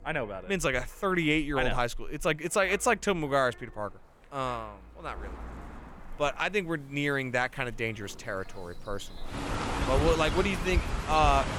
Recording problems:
animal sounds; loud; throughout; 5 dB below the speech
wind noise on the microphone; occasional gusts; 25 dB below the speech

